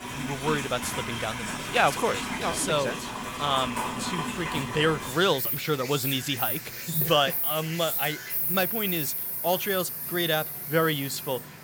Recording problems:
animal sounds; loud; throughout; 2 dB below the speech

